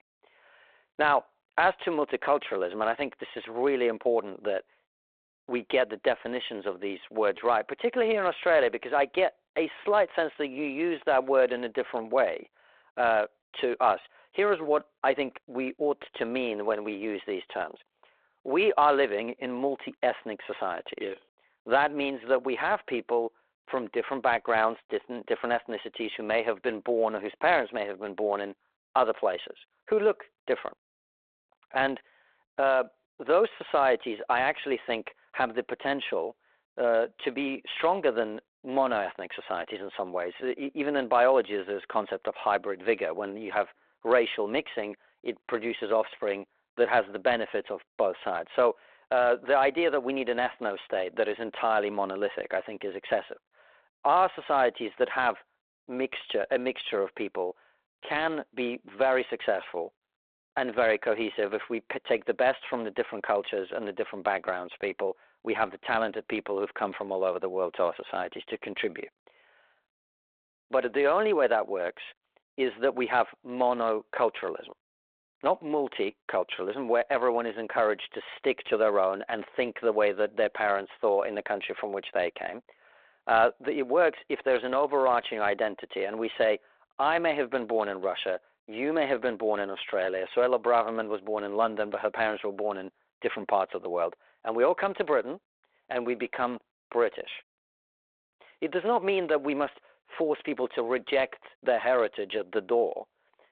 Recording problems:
phone-call audio

